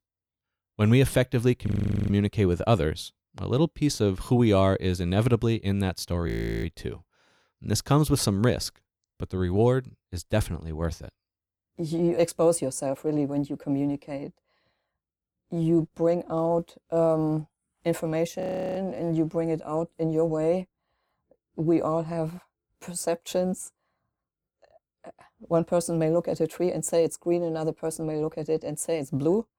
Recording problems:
audio freezing; at 1.5 s, at 6.5 s and at 18 s

